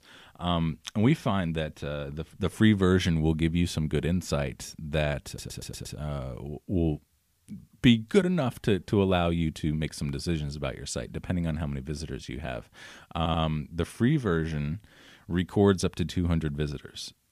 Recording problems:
audio stuttering; at 5.5 s and at 13 s

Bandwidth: 15 kHz